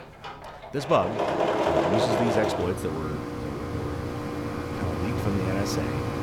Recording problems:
machinery noise; very loud; throughout; 3 dB above the speech

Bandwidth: 18 kHz